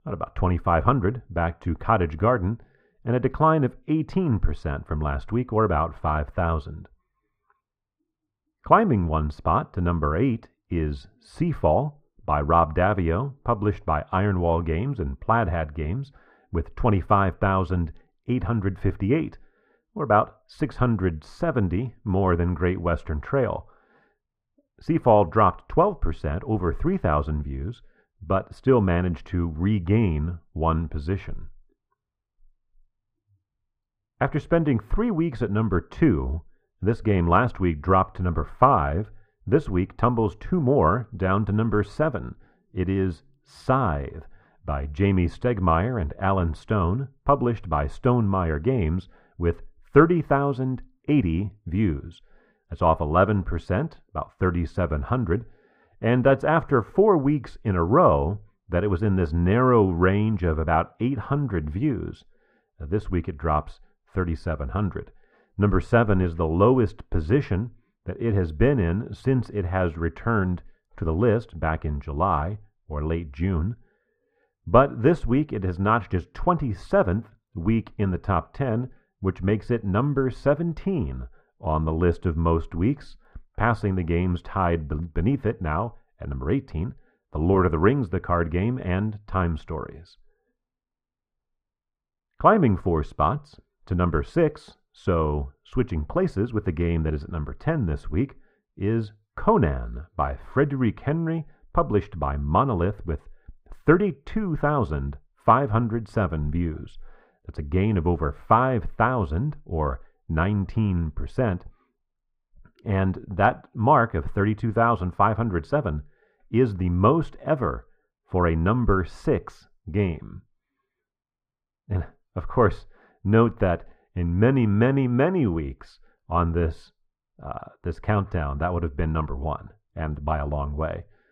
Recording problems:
muffled; very; fading above 3.5 kHz

